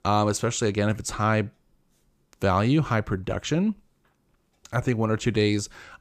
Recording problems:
none

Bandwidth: 15 kHz